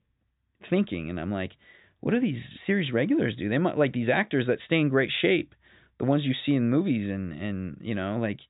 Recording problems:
high frequencies cut off; severe; nothing above 4 kHz

